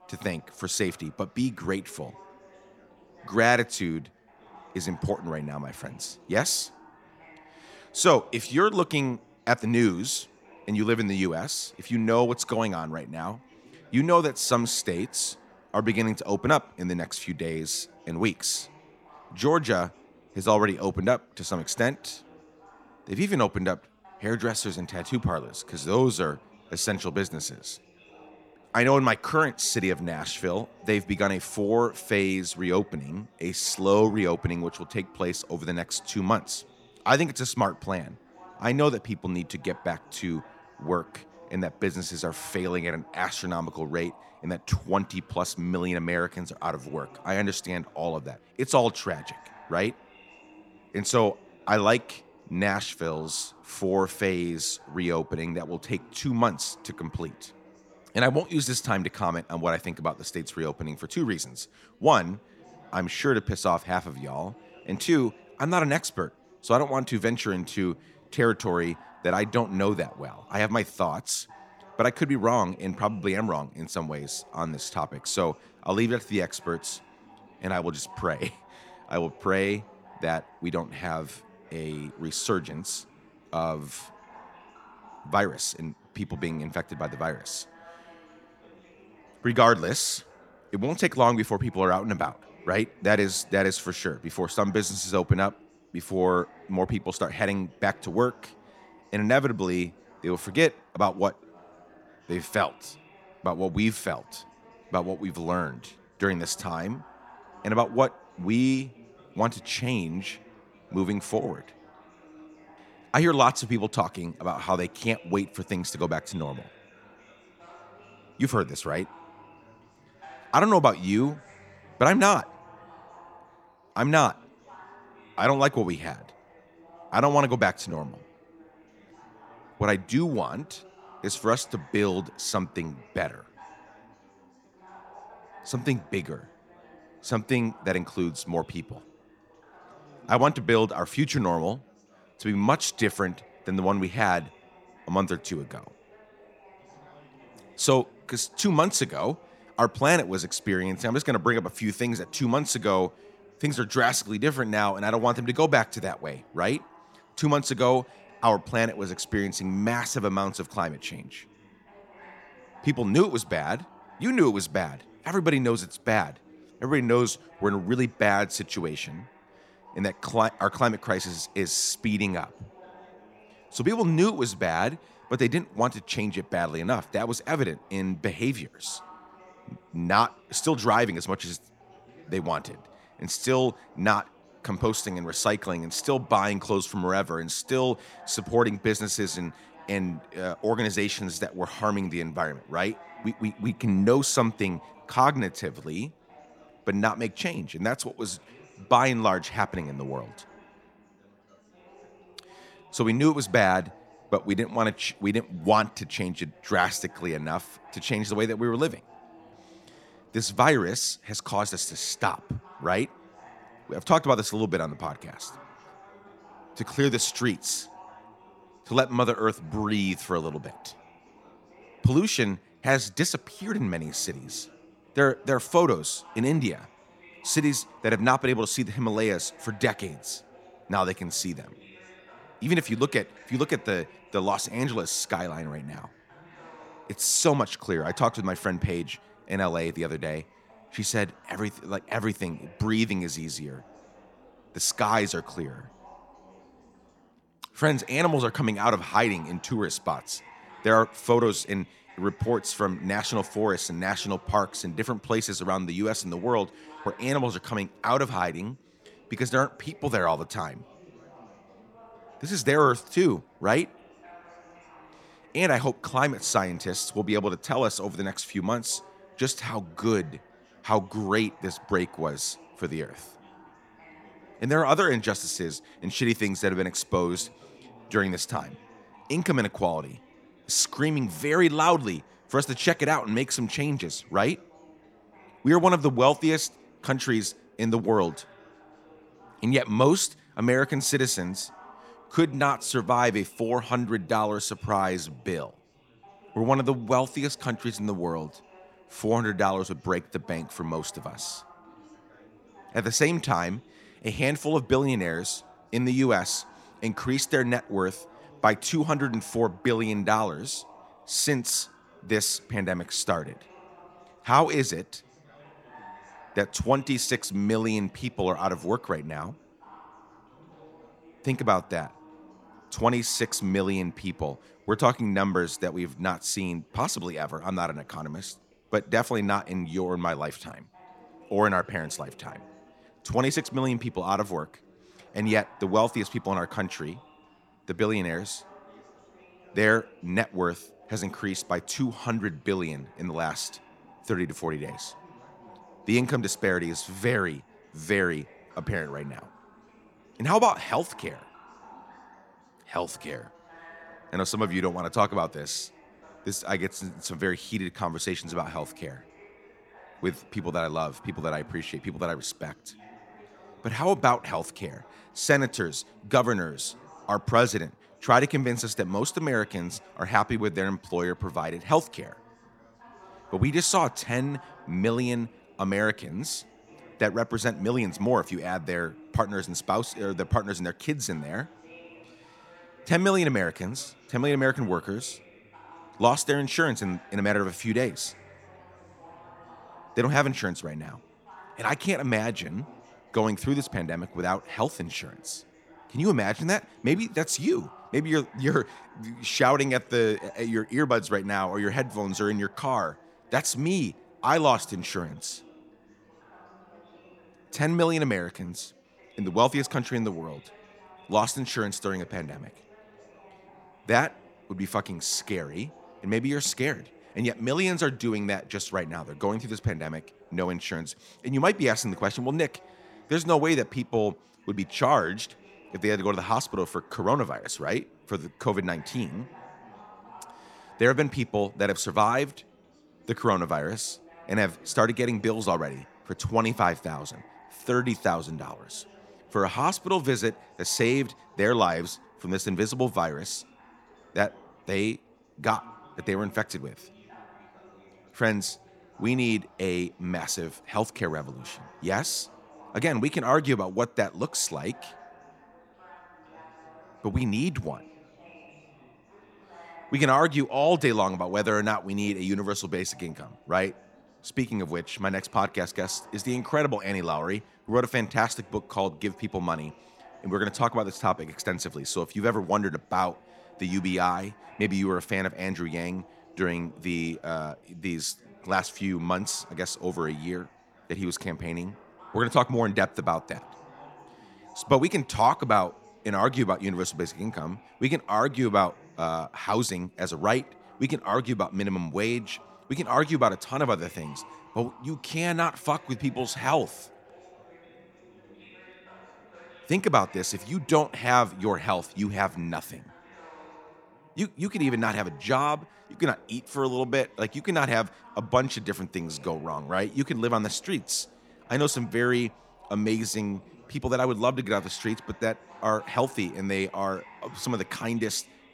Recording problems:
background chatter; faint; throughout; 4 voices, 25 dB below the speech

